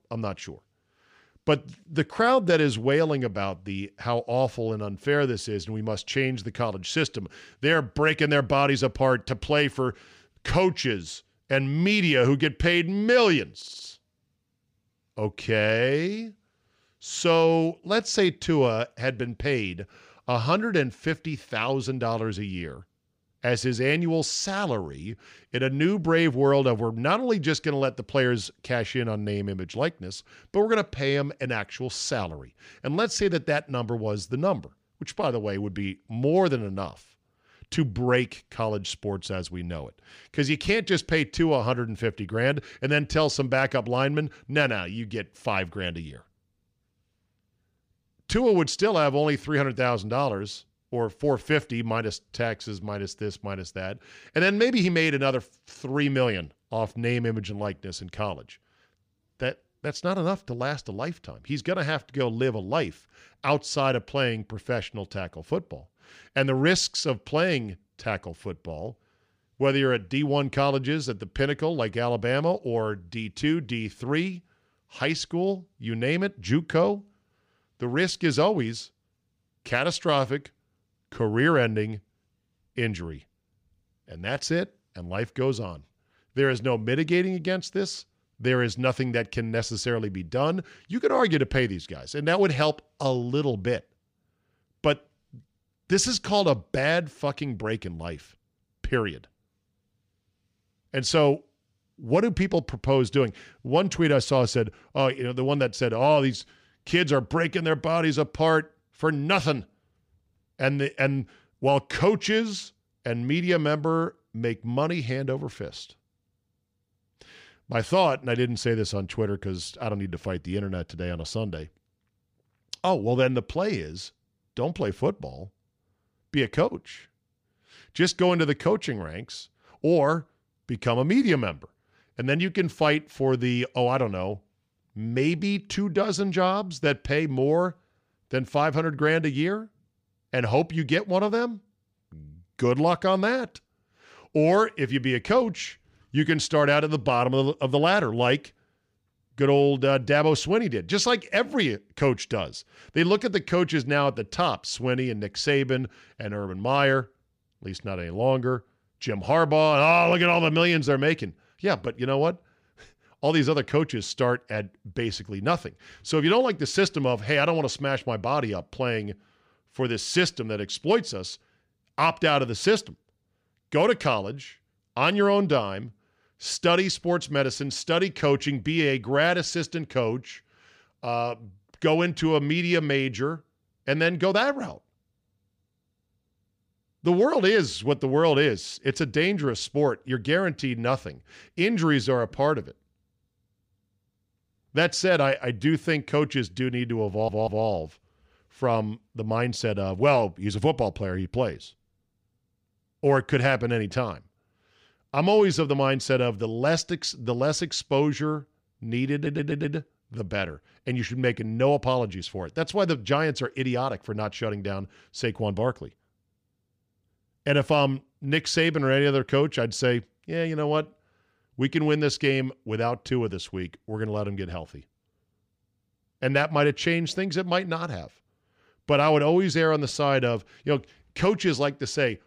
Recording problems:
audio stuttering; at 14 s, at 3:17 and at 3:29

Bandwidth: 15 kHz